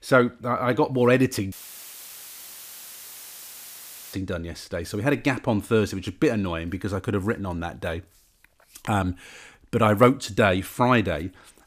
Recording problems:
audio cutting out; filled with static; at 1.5 s for 2.5 s

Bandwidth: 15 kHz